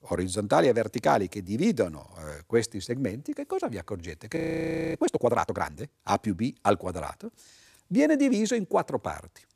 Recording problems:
audio freezing; at 4.5 s for 0.5 s

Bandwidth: 14.5 kHz